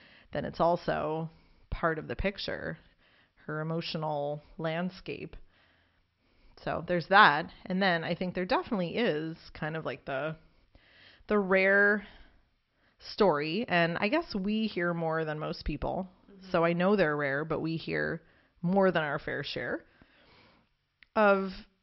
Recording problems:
high frequencies cut off; noticeable; nothing above 5.5 kHz

